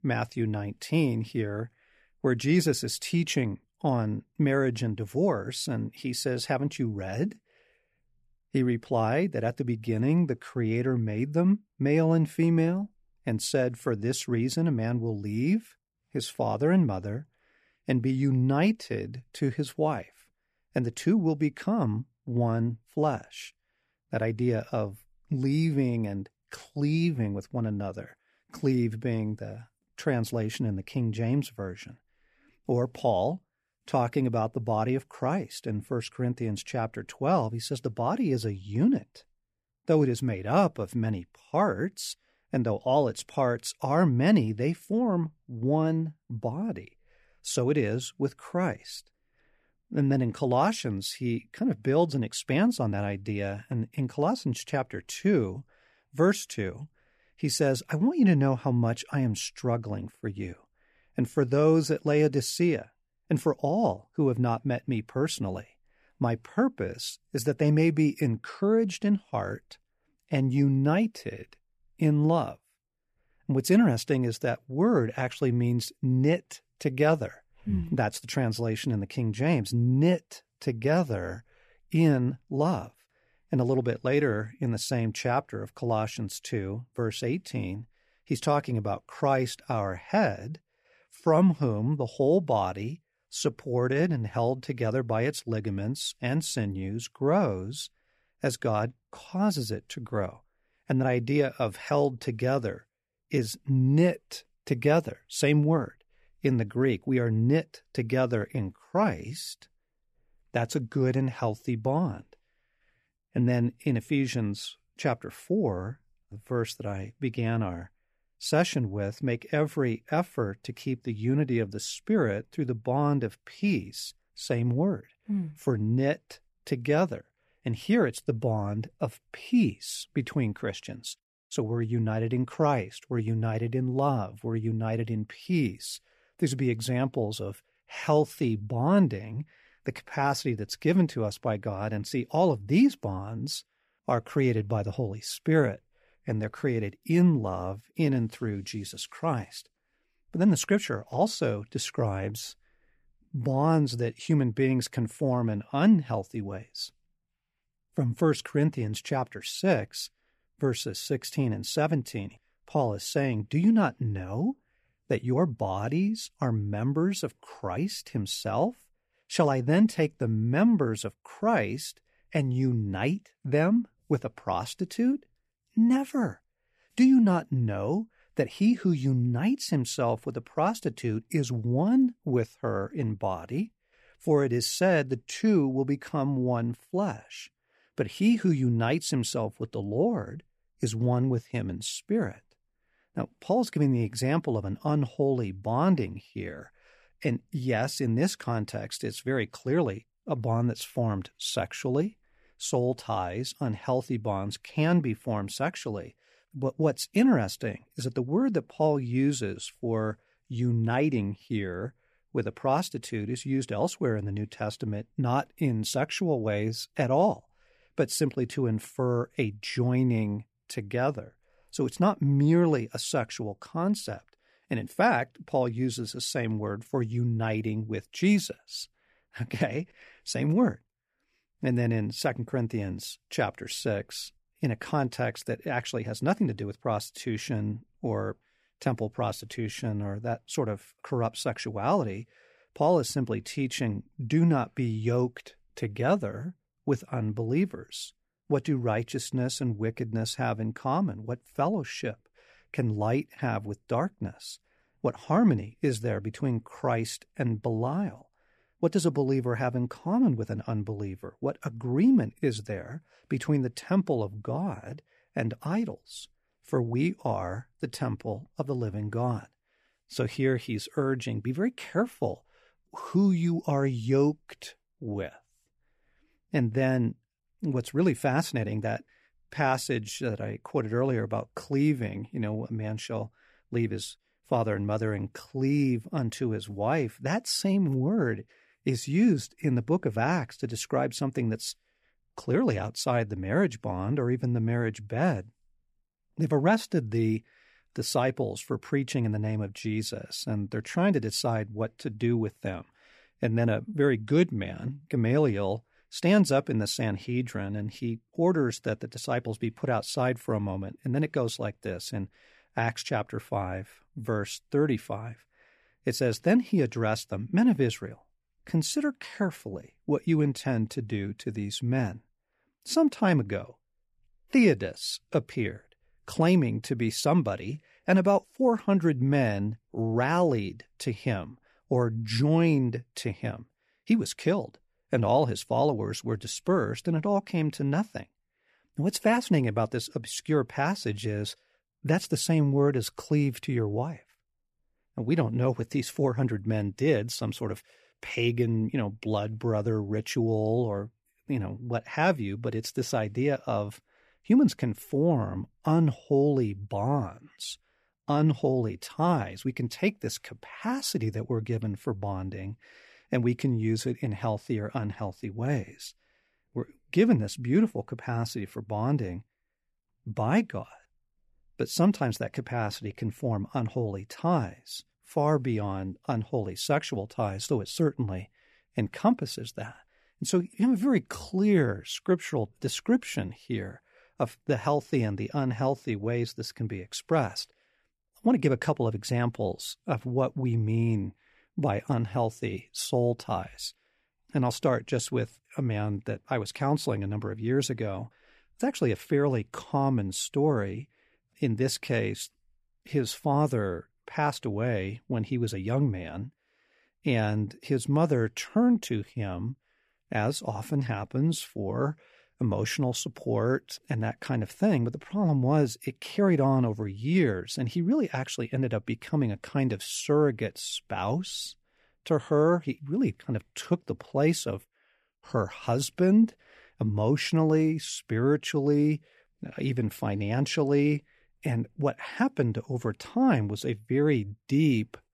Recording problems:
none

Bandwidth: 14.5 kHz